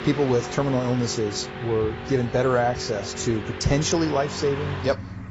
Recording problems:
garbled, watery; badly; nothing above 7.5 kHz
traffic noise; loud; throughout; 9 dB below the speech

